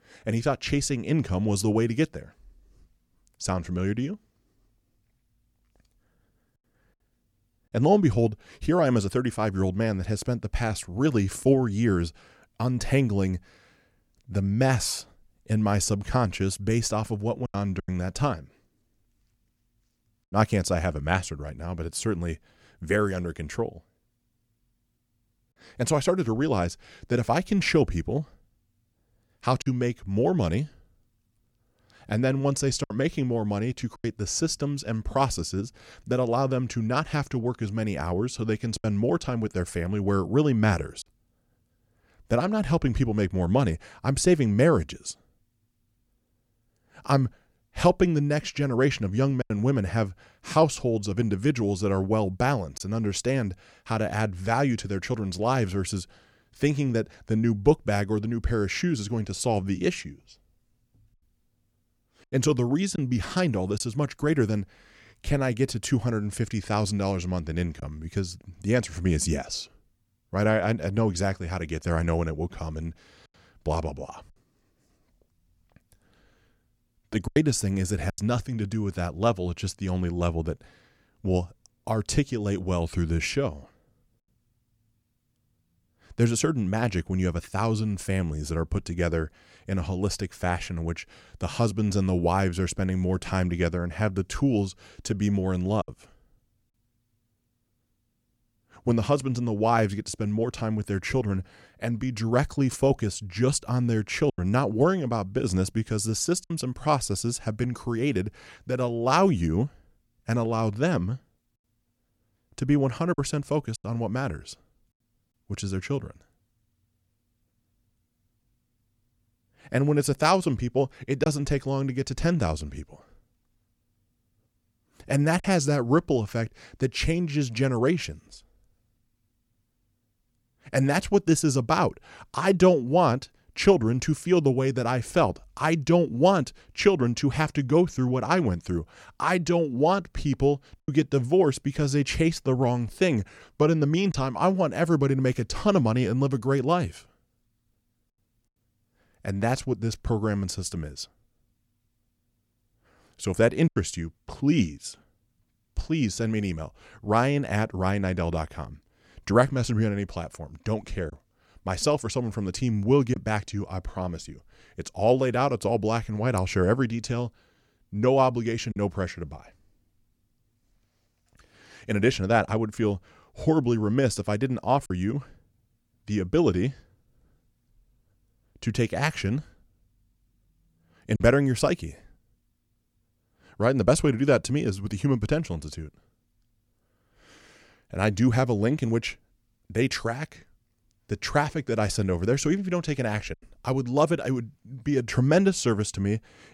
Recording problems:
choppy; occasionally; 1% of the speech affected

